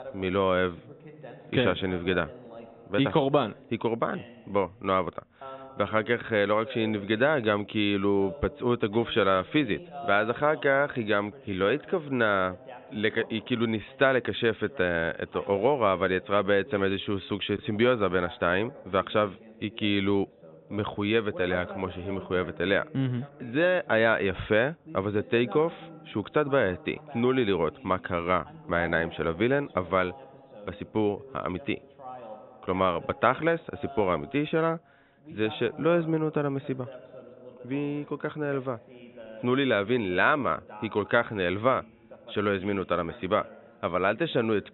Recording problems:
high frequencies cut off; severe; nothing above 3.5 kHz
voice in the background; noticeable; throughout; 20 dB below the speech

